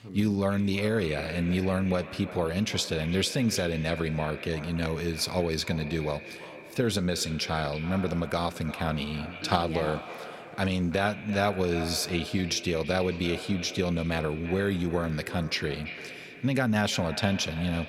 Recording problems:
echo of what is said; noticeable; throughout; 340 ms later, 10 dB below the speech

